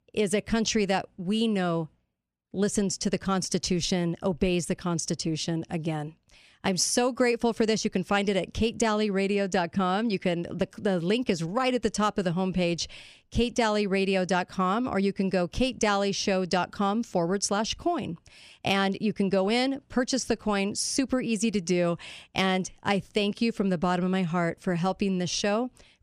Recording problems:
none

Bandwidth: 14.5 kHz